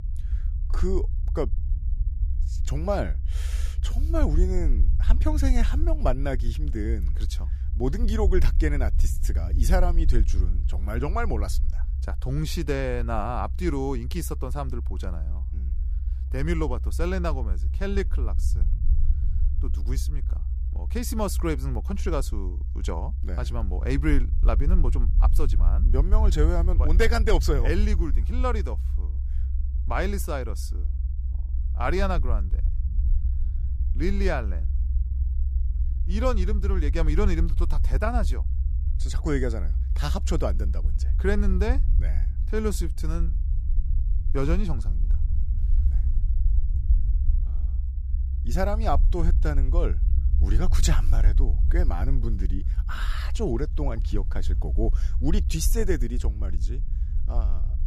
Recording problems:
low rumble; noticeable; throughout; 15 dB below the speech

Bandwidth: 15 kHz